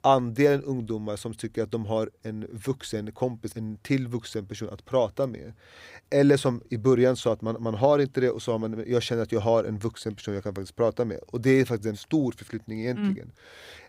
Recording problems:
none

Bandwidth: 15.5 kHz